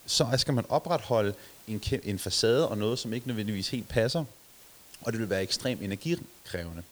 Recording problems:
hiss; faint; throughout; 20 dB below the speech

